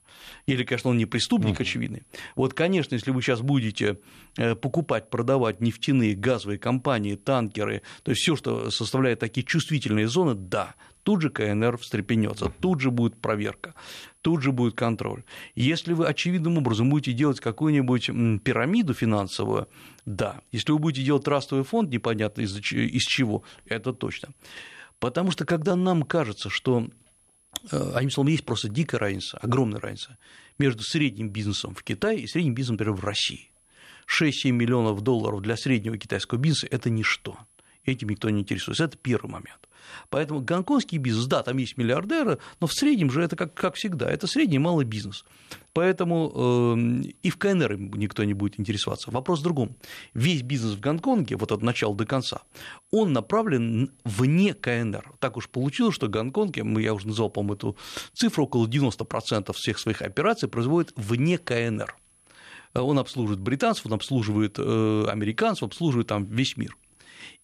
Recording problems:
high-pitched whine; faint; throughout; 10.5 kHz, 35 dB below the speech

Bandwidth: 13.5 kHz